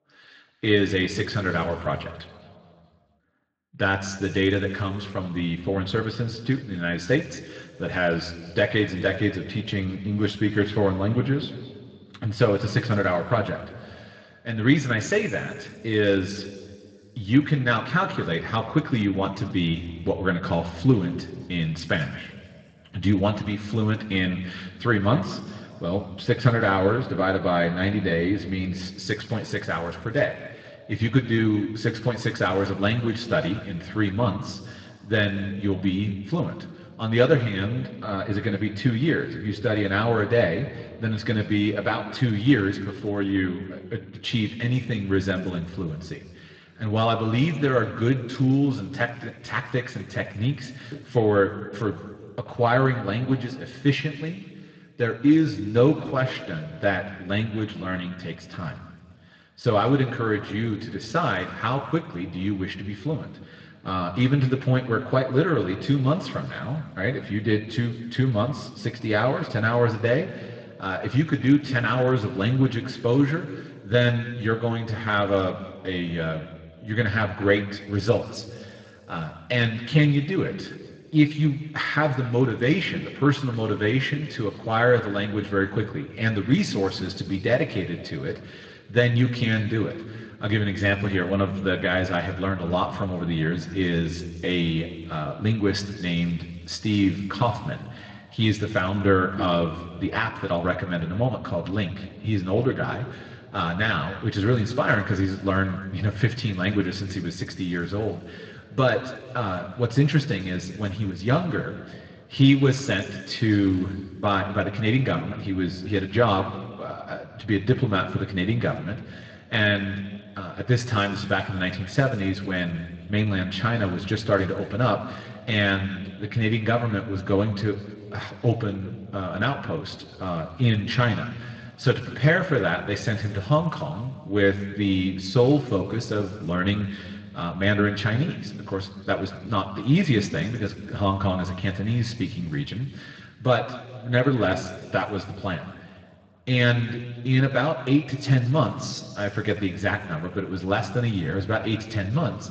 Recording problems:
room echo; noticeable; dies away in 1.8 s
off-mic speech; somewhat distant
garbled, watery; slightly; nothing above 7.5 kHz

